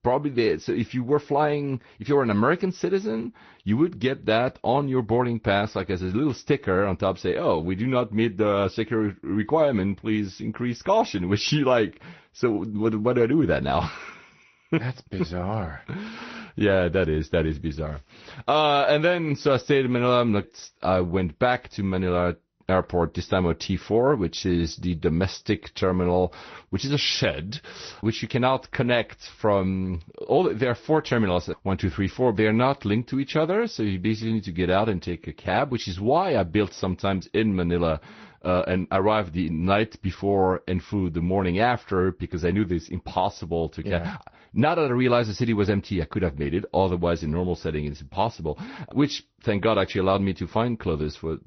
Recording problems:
garbled, watery; slightly; nothing above 6 kHz

